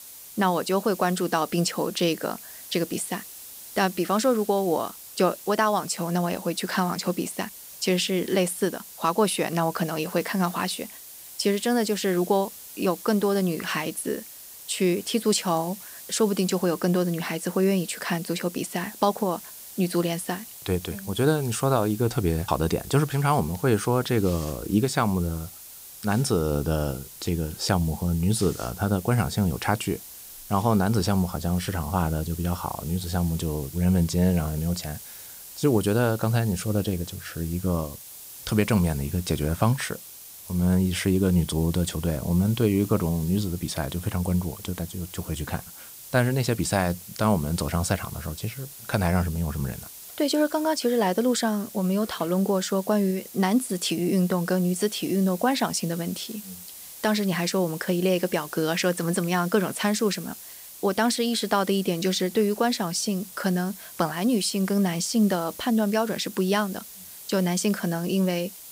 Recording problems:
hiss; noticeable; throughout; 15 dB below the speech

